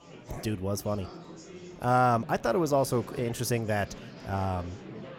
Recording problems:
murmuring crowd; noticeable; throughout; 15 dB below the speech

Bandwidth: 16.5 kHz